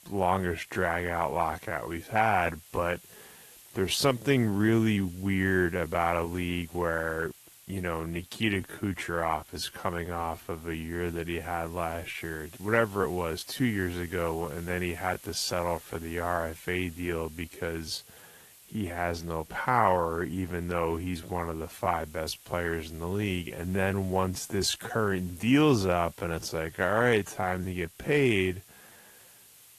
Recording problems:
wrong speed, natural pitch; too slow; 0.6 times normal speed
garbled, watery; slightly; nothing above 13.5 kHz
hiss; faint; throughout; 20 dB below the speech

